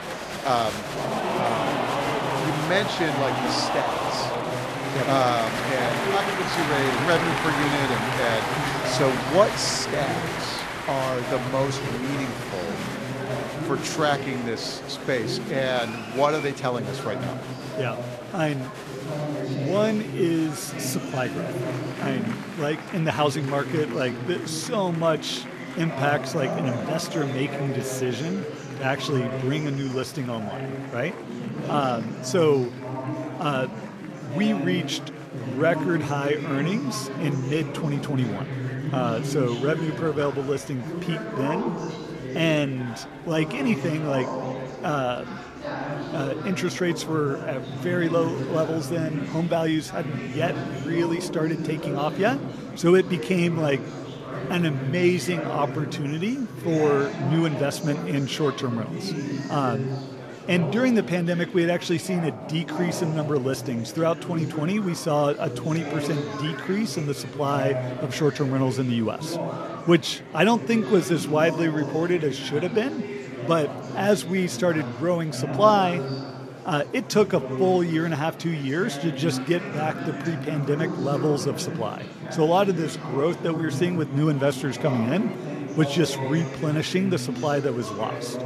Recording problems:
murmuring crowd; loud; throughout; 5 dB below the speech

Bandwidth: 14 kHz